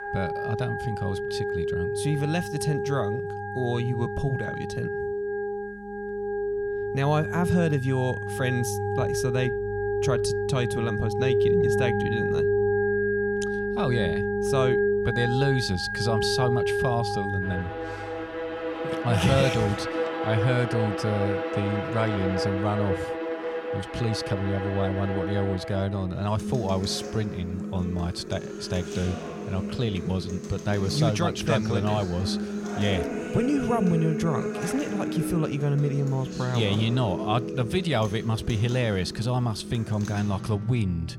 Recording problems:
background music; loud; throughout; 2 dB below the speech

